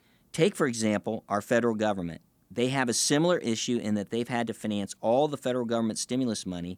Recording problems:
none

